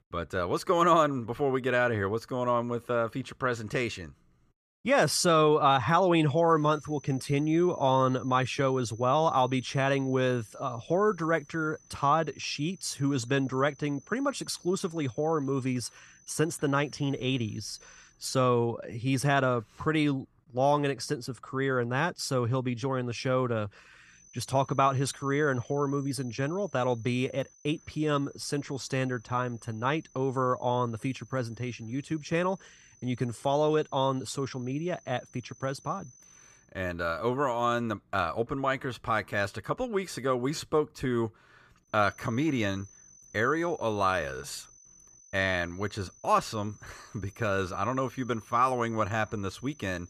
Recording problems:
high-pitched whine; faint; from 6.5 to 18 s, from 24 to 37 s and from 42 s on; 6 kHz, 25 dB below the speech

